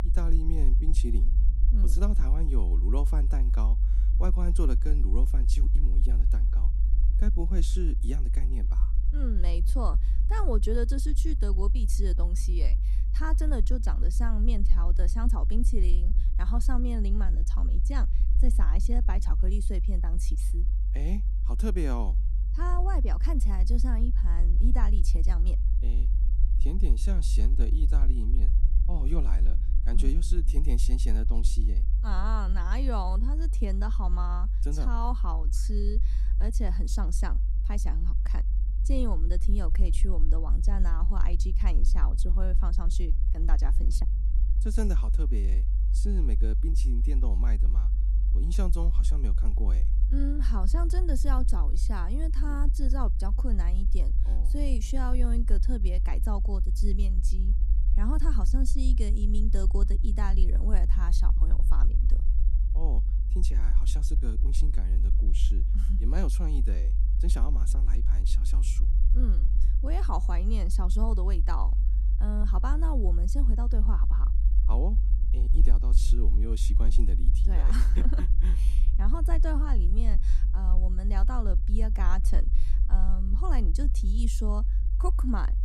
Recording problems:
low rumble; loud; throughout; 9 dB below the speech

